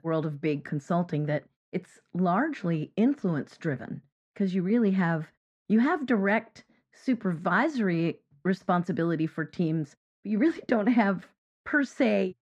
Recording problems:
muffled; very; fading above 2 kHz

